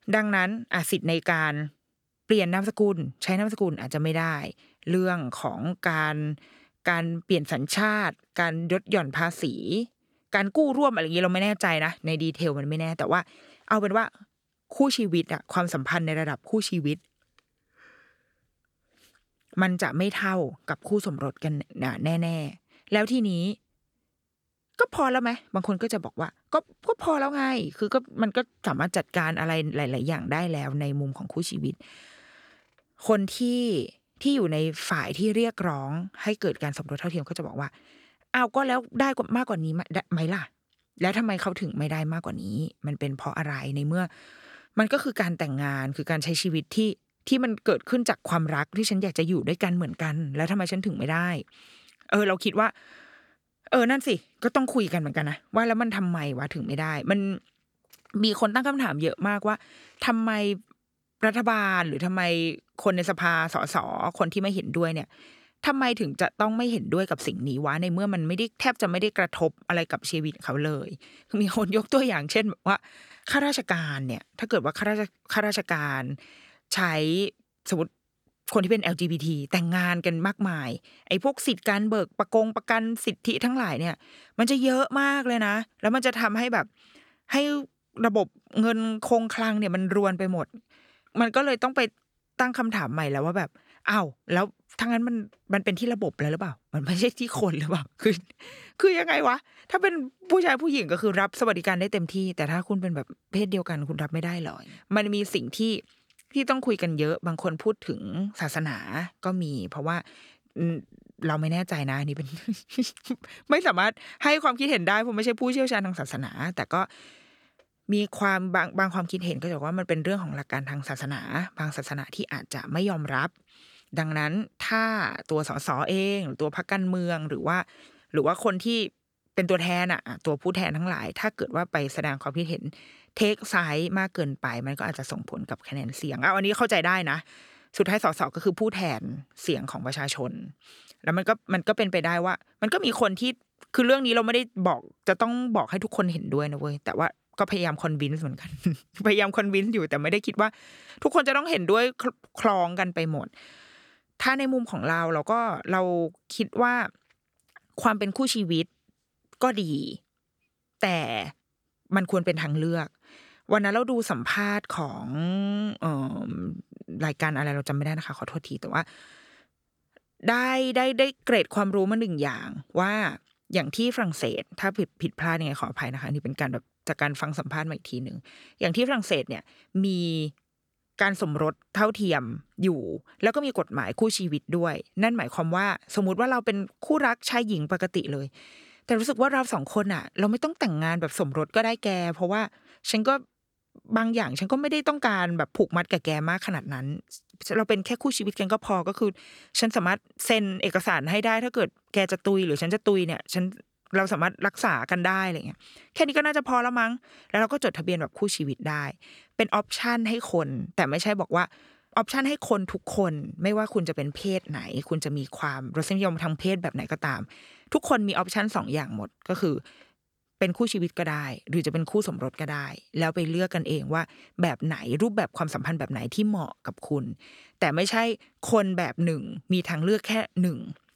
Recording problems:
none

